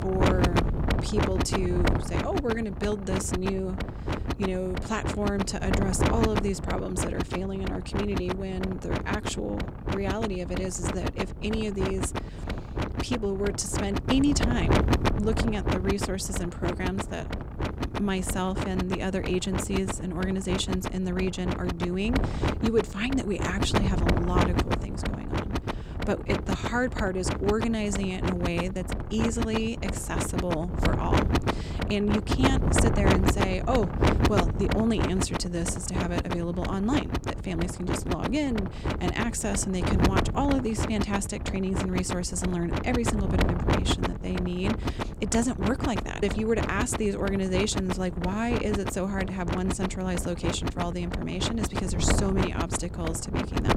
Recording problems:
wind noise on the microphone; heavy; 1 dB below the speech

